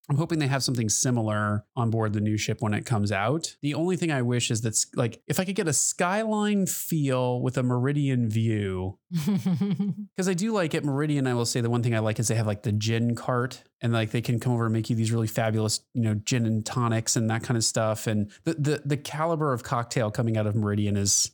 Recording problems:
none

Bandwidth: 18.5 kHz